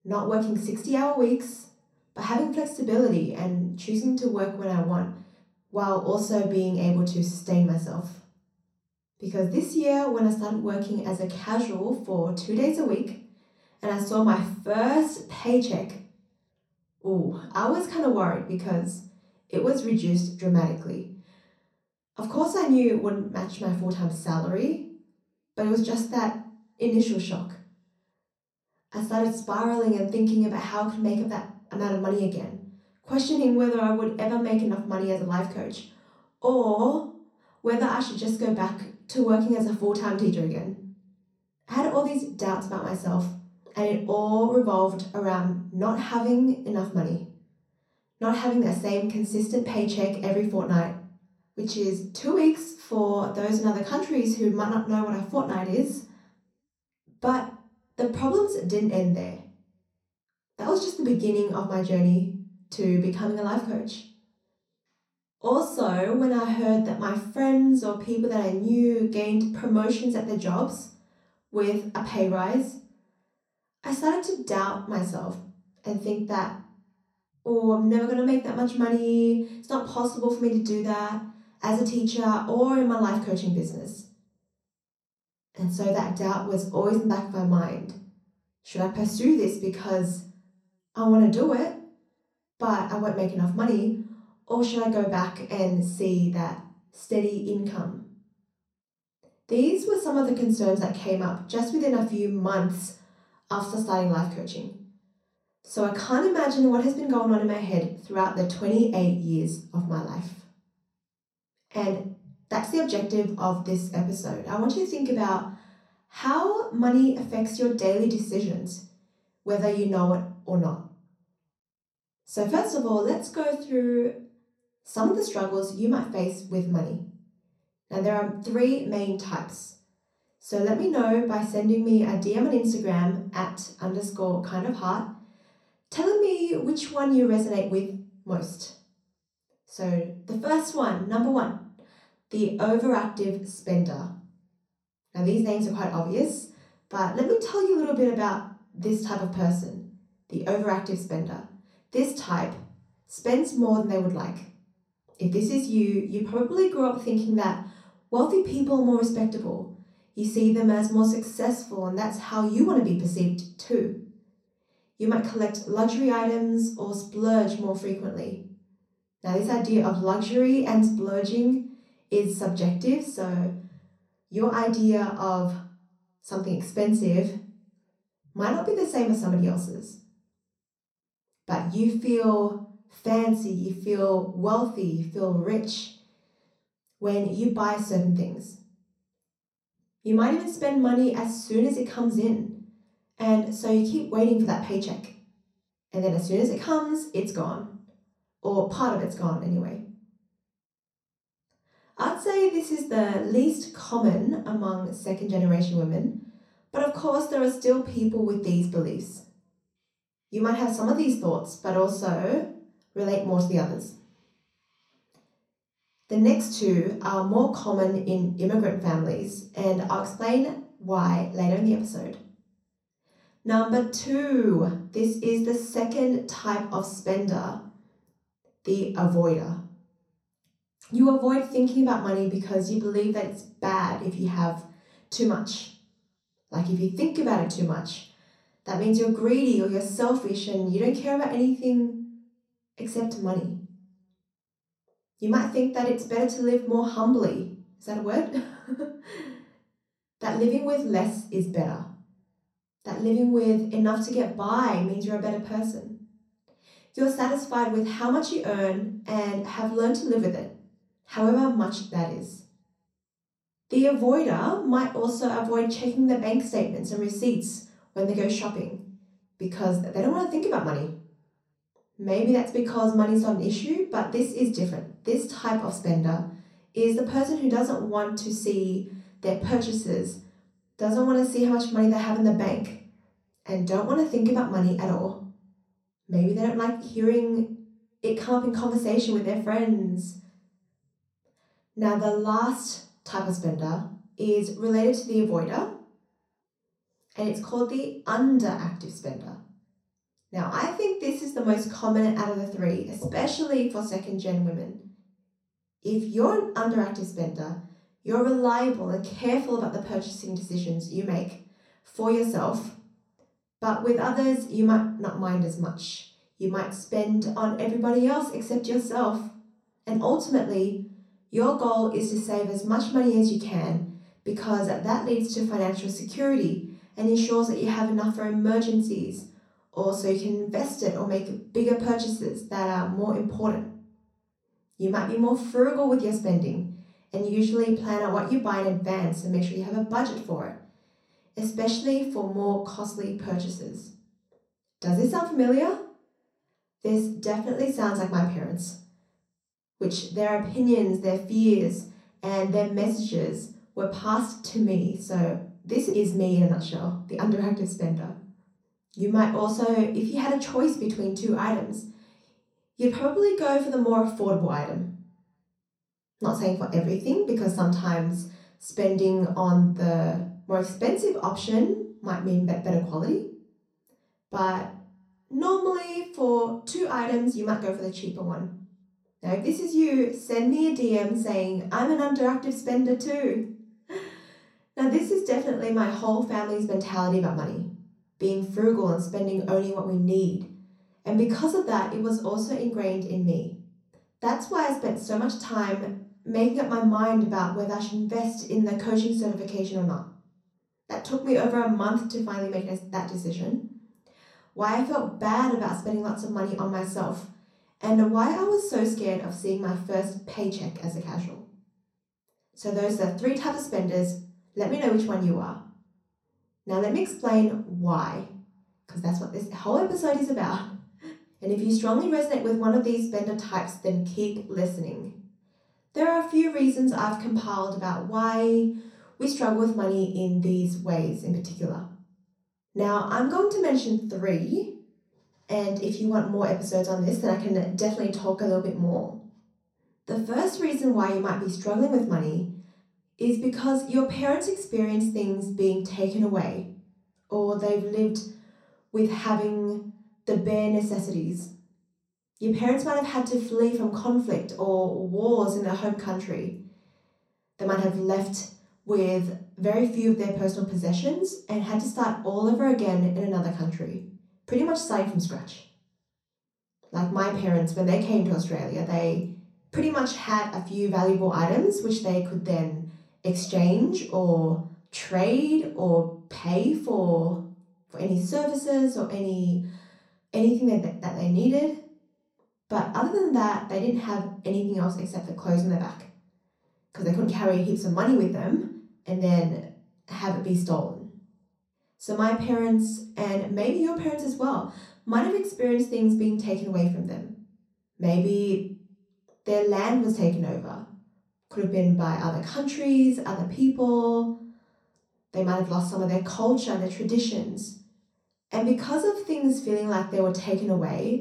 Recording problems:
off-mic speech; far
room echo; noticeable; dies away in 0.6 s

